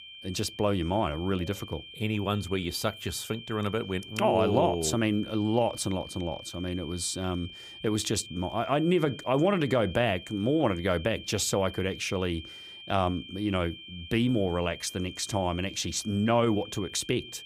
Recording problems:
high-pitched whine; noticeable; throughout; 3 kHz, 15 dB below the speech

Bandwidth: 15.5 kHz